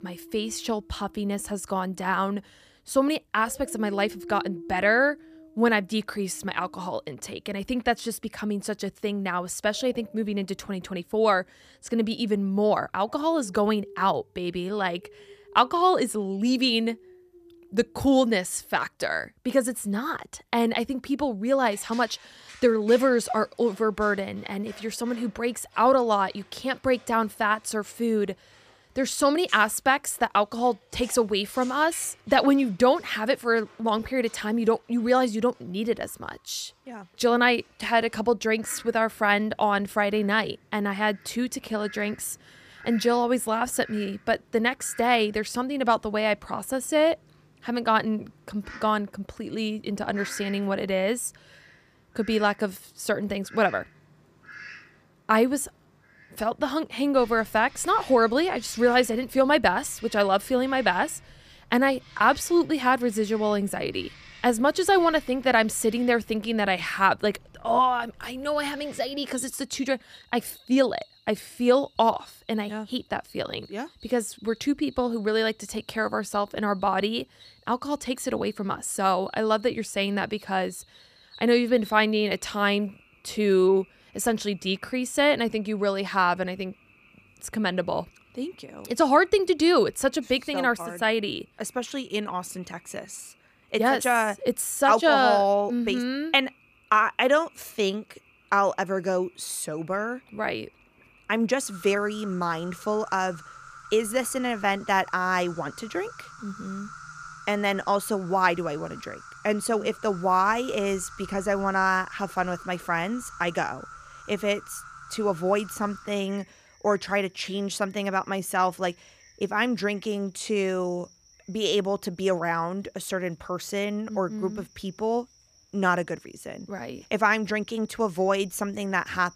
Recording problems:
animal sounds; faint; throughout; 25 dB below the speech

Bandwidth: 14.5 kHz